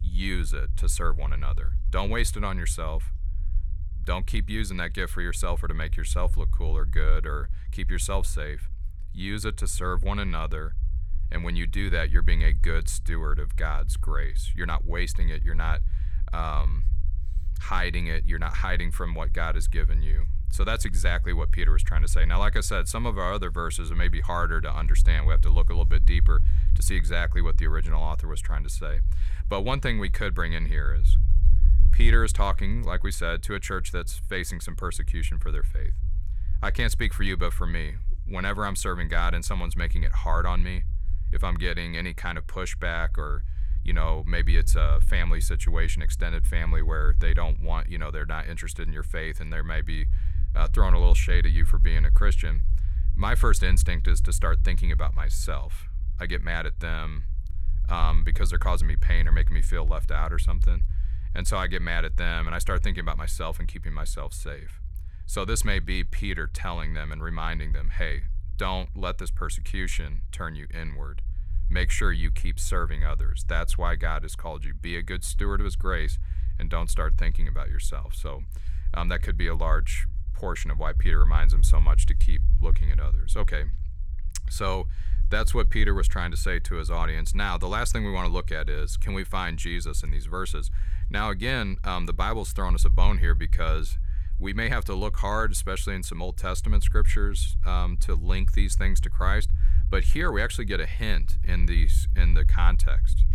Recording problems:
low rumble; noticeable; throughout; 20 dB below the speech

